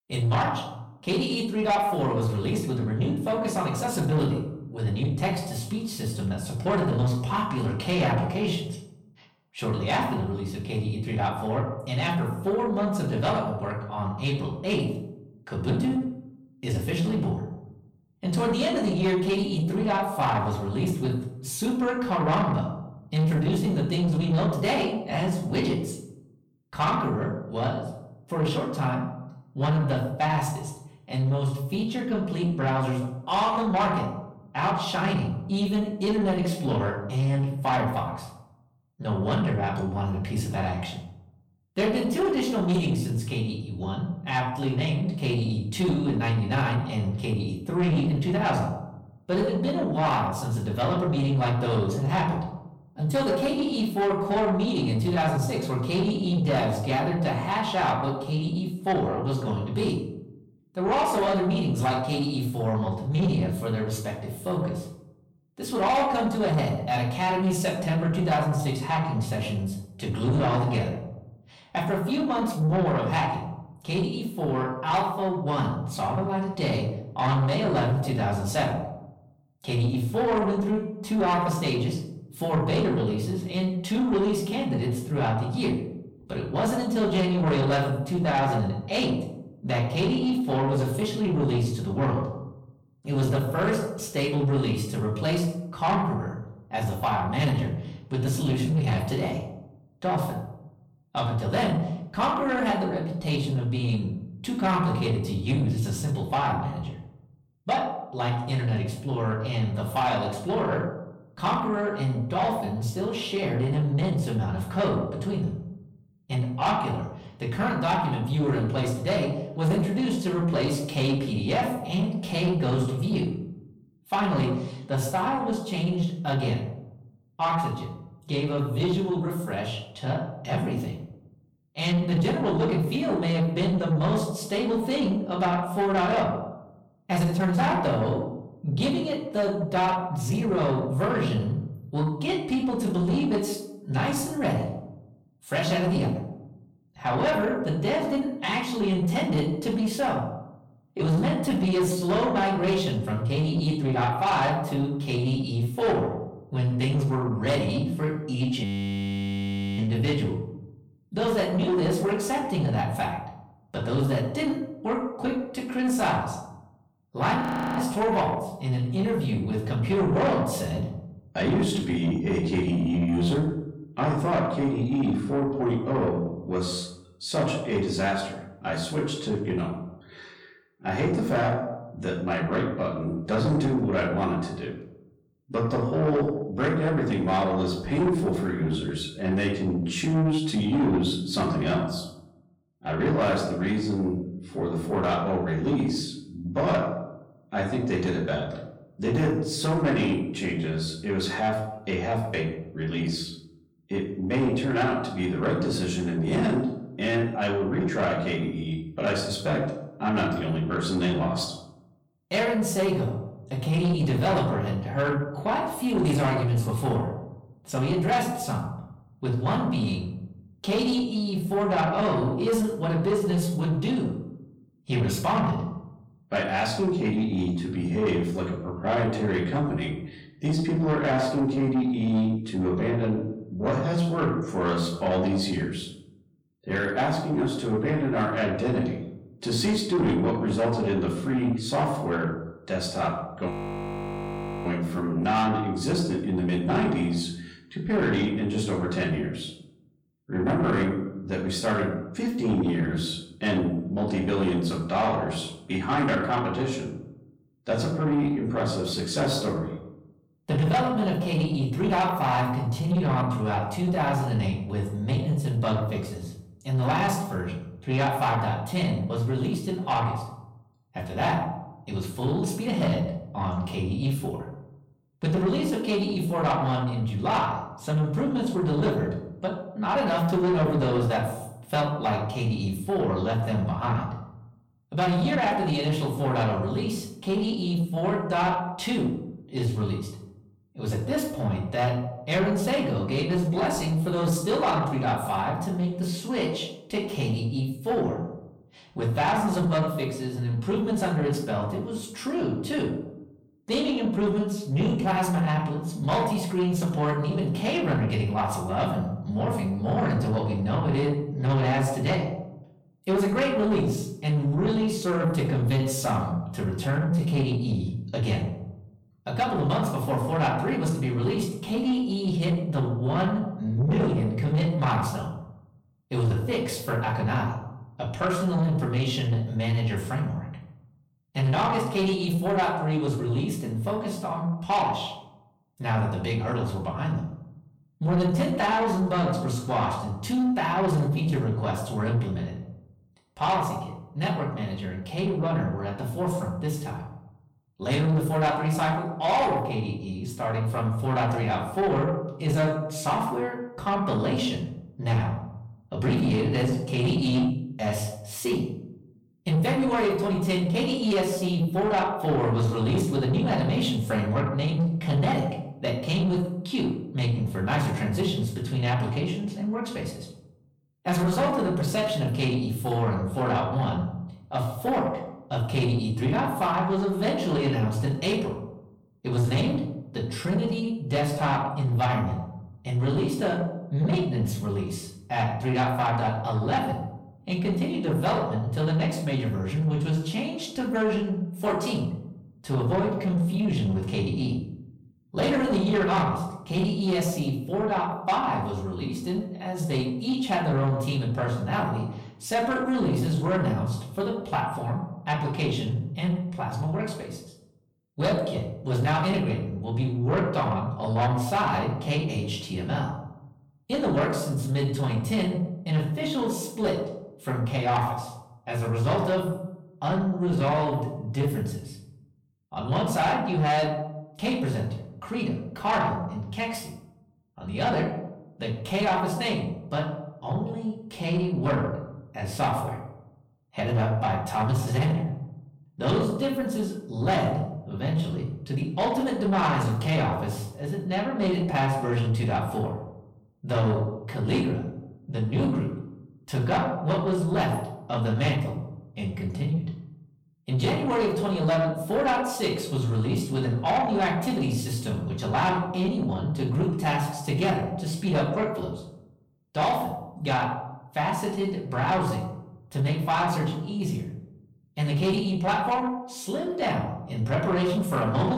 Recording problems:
off-mic speech; far
room echo; noticeable; dies away in 0.6 s
distortion; slight; 10 dB below the speech
audio freezing; at 2:39 for 1 s, at 2:47 and at 4:04 for 1 s
abrupt cut into speech; at the end

